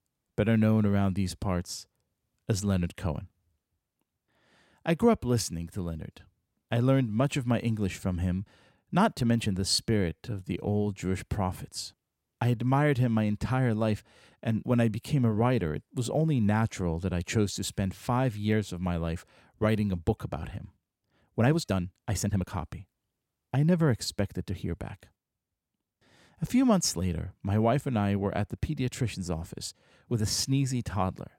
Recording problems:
uneven, jittery; strongly; from 8.5 to 23 s

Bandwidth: 16.5 kHz